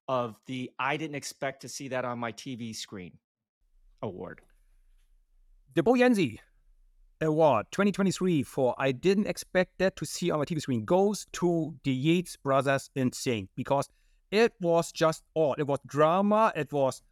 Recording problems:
uneven, jittery; strongly; from 1 to 16 s

